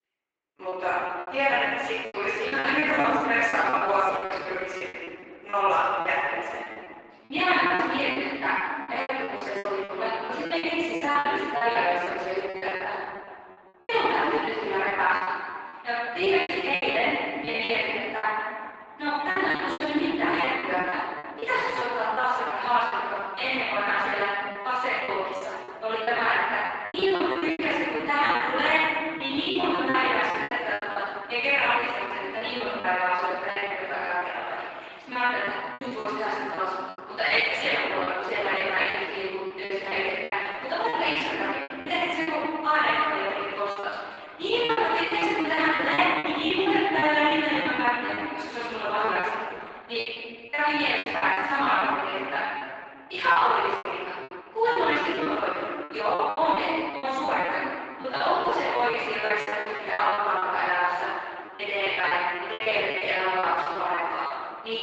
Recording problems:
room echo; strong; dies away in 2.3 s
off-mic speech; far
thin; somewhat; fading below 300 Hz
garbled, watery; slightly; nothing above 8 kHz
choppy; very; 16% of the speech affected

